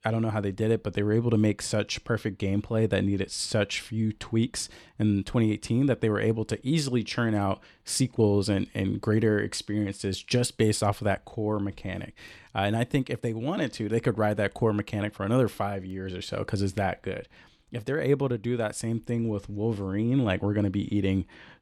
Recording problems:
none

